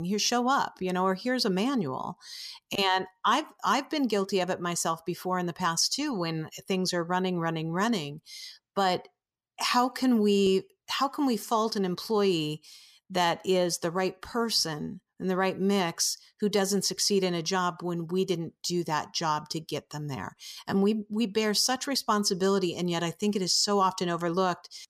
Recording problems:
abrupt cut into speech; at the start

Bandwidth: 14.5 kHz